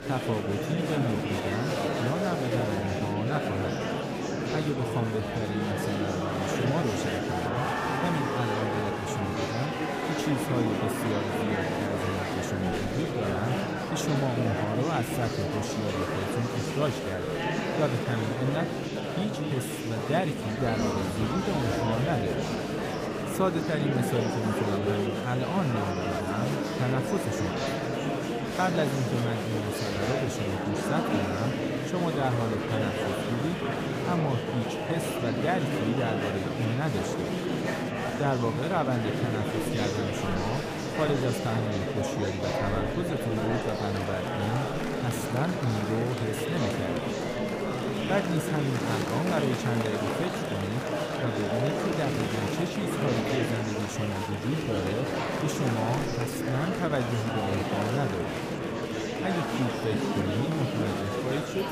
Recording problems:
murmuring crowd; very loud; throughout; 2 dB above the speech

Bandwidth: 15 kHz